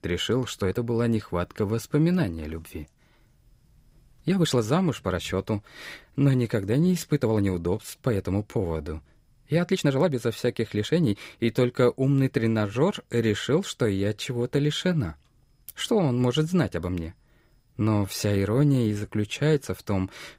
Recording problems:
uneven, jittery; strongly; from 0.5 to 20 s

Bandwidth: 15.5 kHz